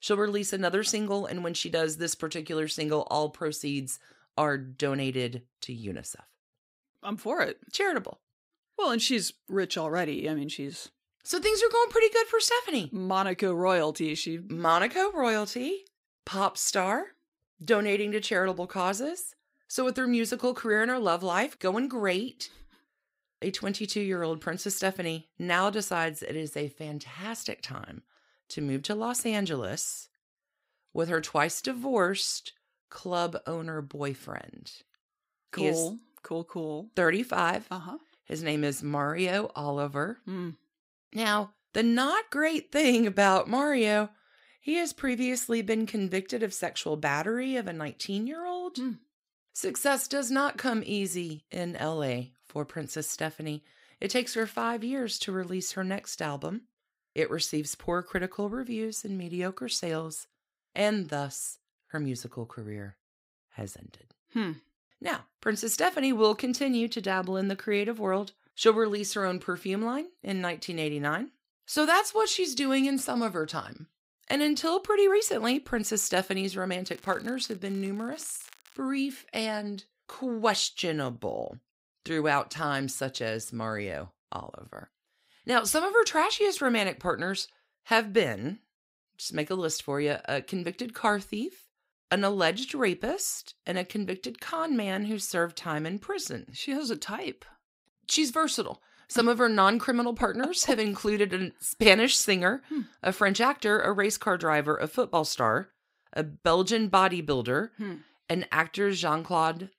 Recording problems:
crackling; faint; at 54 s and from 1:17 to 1:19; 25 dB below the speech

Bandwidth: 15.5 kHz